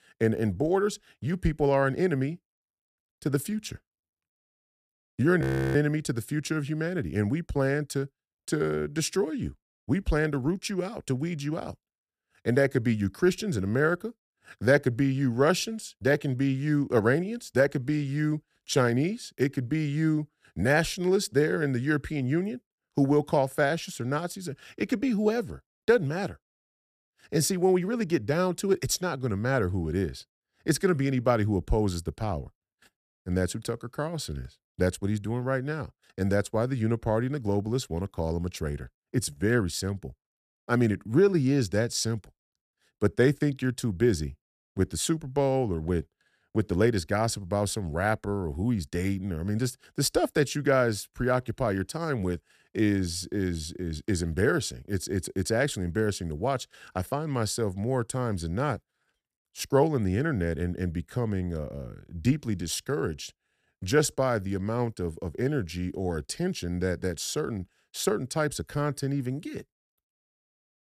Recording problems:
audio freezing; at 5.5 s

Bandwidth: 14.5 kHz